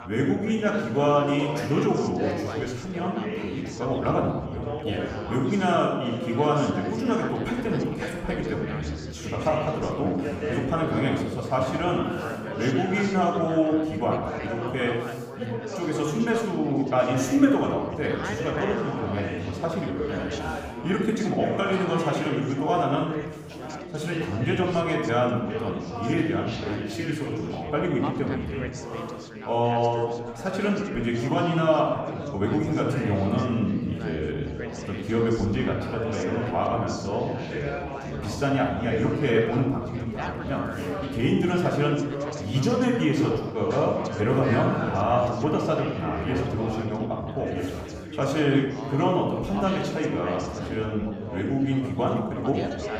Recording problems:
off-mic speech; far
room echo; noticeable; dies away in 0.9 s
chatter from many people; loud; throughout; 9 dB below the speech

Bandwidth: 15.5 kHz